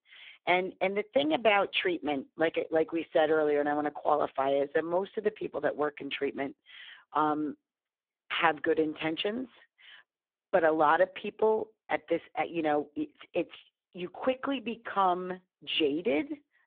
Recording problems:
phone-call audio; poor line; nothing above 3.5 kHz

